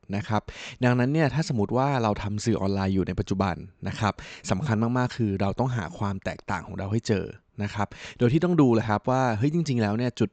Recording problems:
high frequencies cut off; noticeable; nothing above 8 kHz

